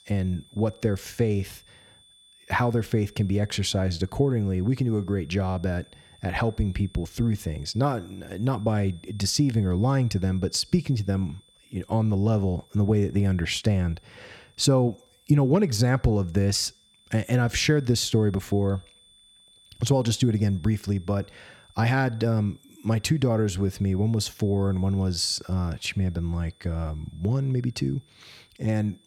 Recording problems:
high-pitched whine; faint; throughout; 3.5 kHz, 30 dB below the speech

